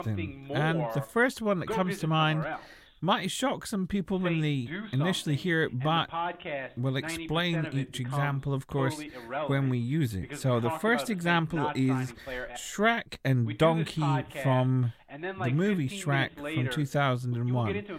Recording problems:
voice in the background; loud; throughout; 8 dB below the speech

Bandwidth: 16 kHz